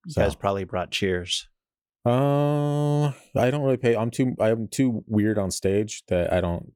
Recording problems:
none

